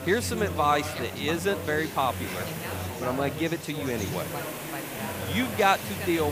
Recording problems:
background chatter; loud; throughout; 3 voices, 8 dB below the speech
hiss; noticeable; throughout; 10 dB below the speech
abrupt cut into speech; at the end

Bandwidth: 15 kHz